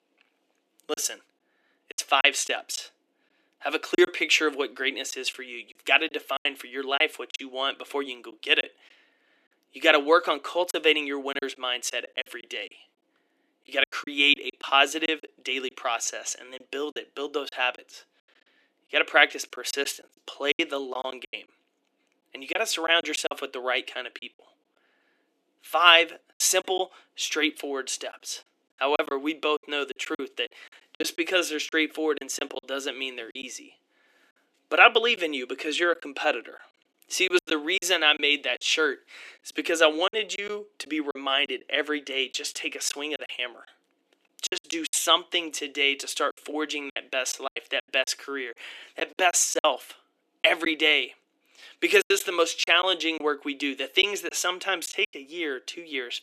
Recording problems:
thin; somewhat; fading below 300 Hz
choppy; very; 8% of the speech affected

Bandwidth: 14 kHz